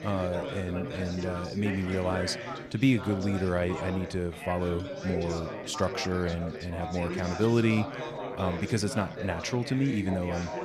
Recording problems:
chatter from many people; loud; throughout; 7 dB below the speech

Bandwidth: 14 kHz